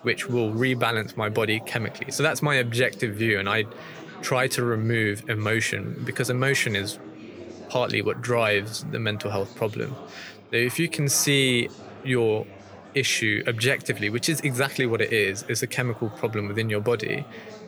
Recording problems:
chatter from many people; noticeable; throughout; 20 dB below the speech

